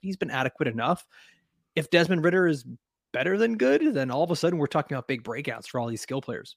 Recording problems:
none

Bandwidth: 15 kHz